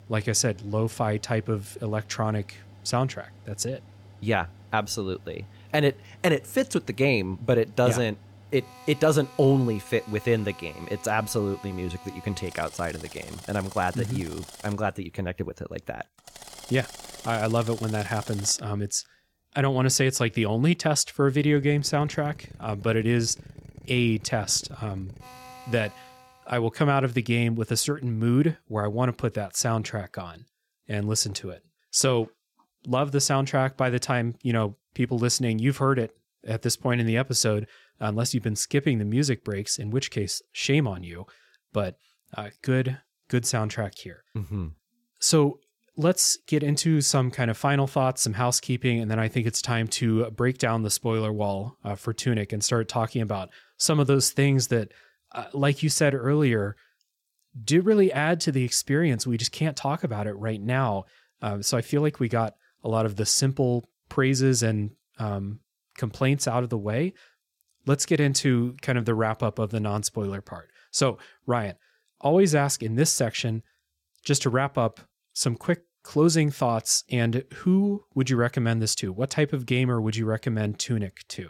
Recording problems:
machinery noise; faint; until 26 s; 20 dB below the speech

